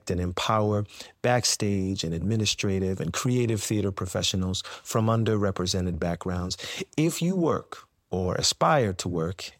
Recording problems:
none

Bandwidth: 16 kHz